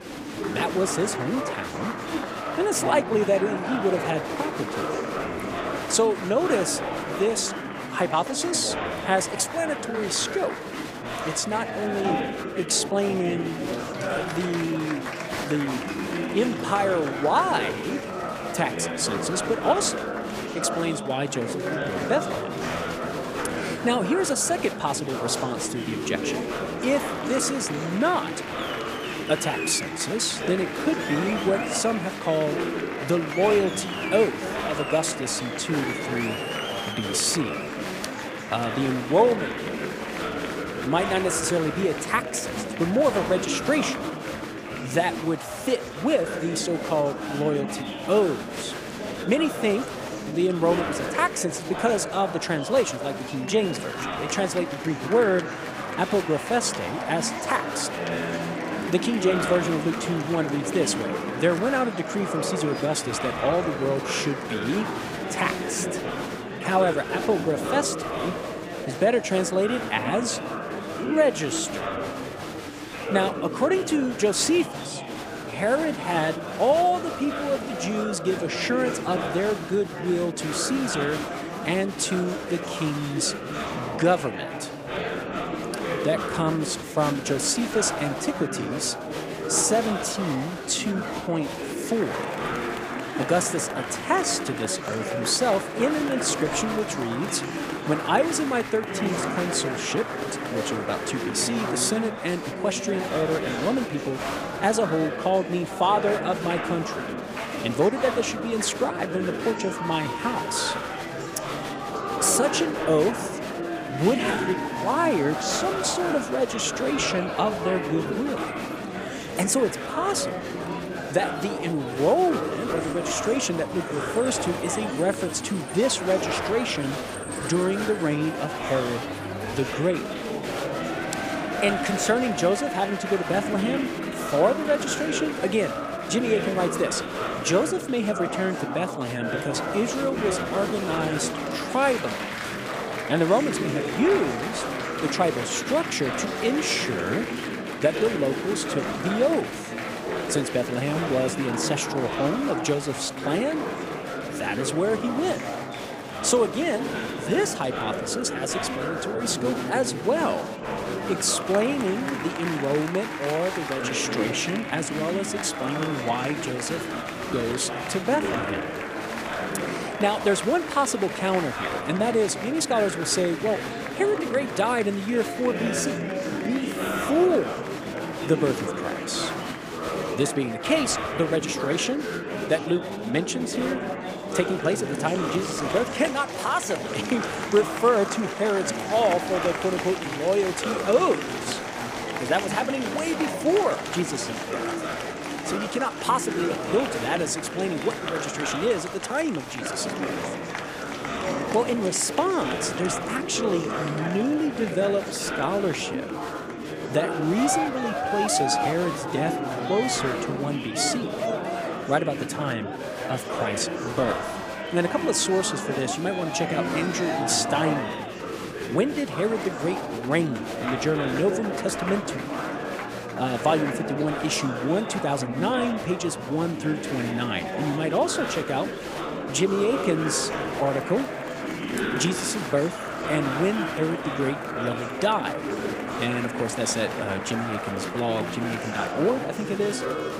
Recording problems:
chatter from many people; loud; throughout; 4 dB below the speech

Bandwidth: 15 kHz